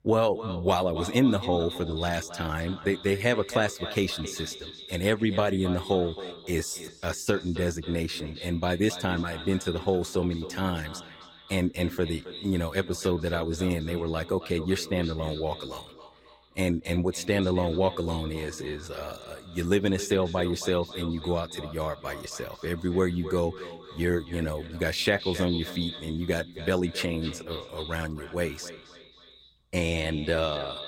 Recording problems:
echo of what is said; strong; throughout; 270 ms later, 10 dB below the speech

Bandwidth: 16.5 kHz